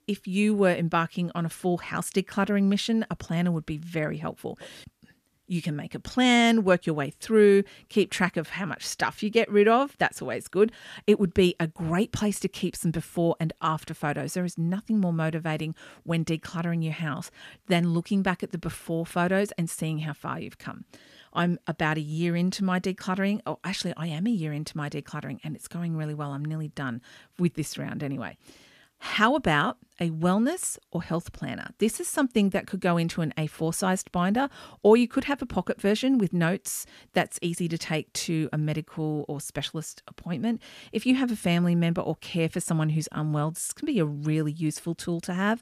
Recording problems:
none

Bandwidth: 14.5 kHz